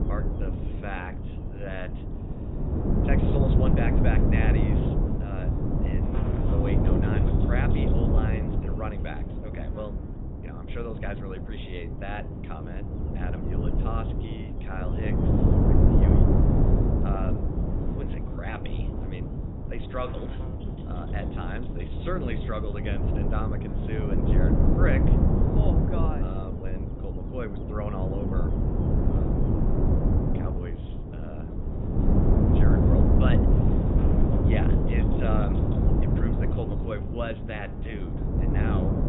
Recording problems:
high frequencies cut off; severe; nothing above 3.5 kHz
wind noise on the microphone; heavy; 2 dB above the speech
electrical hum; noticeable; throughout; 50 Hz, 15 dB below the speech

